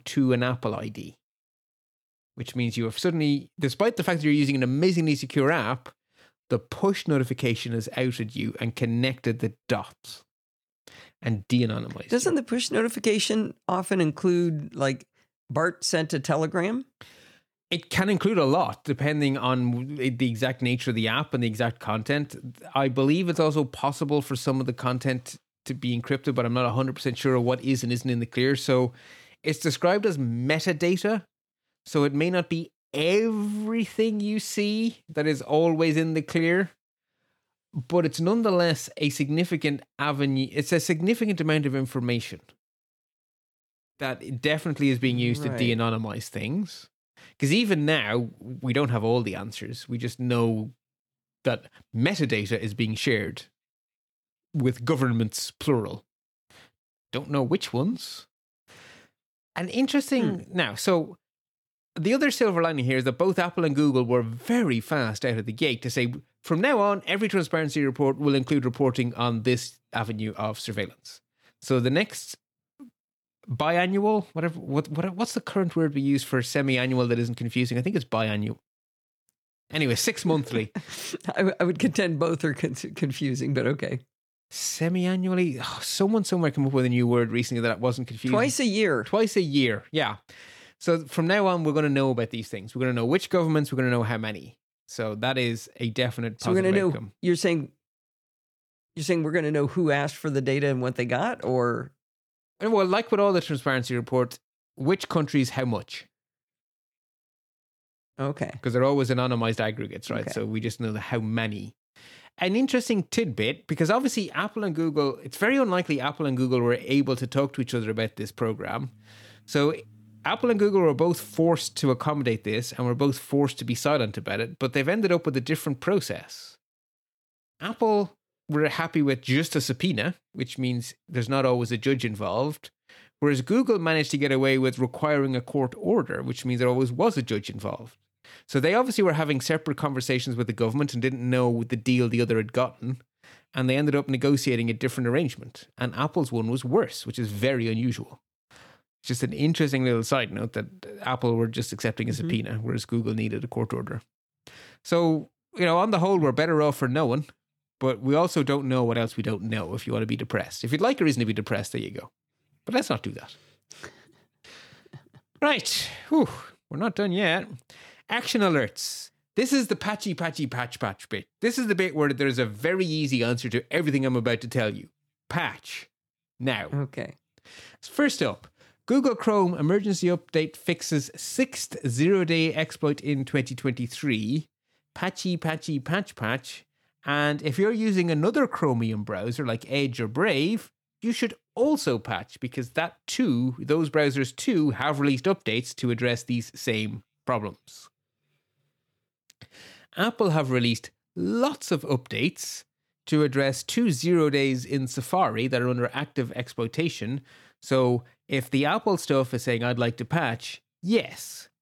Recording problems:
none

